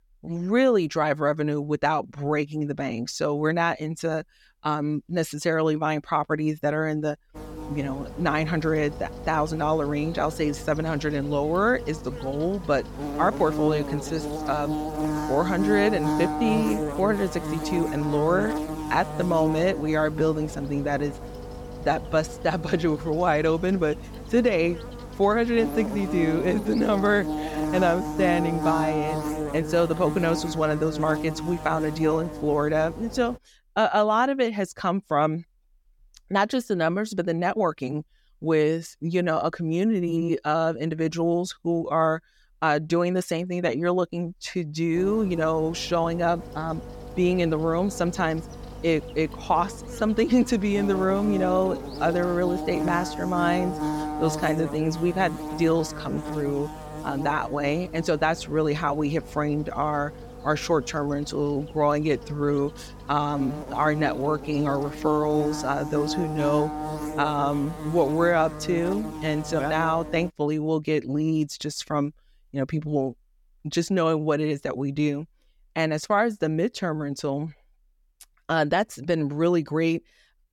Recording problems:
electrical hum; loud; from 7.5 to 33 s and from 45 s to 1:10; 50 Hz, 9 dB below the speech

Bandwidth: 17 kHz